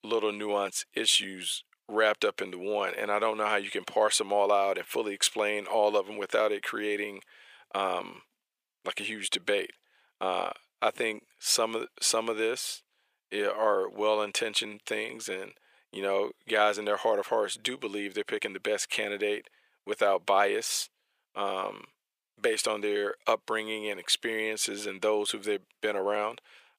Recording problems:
thin; very; fading below 500 Hz

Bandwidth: 15 kHz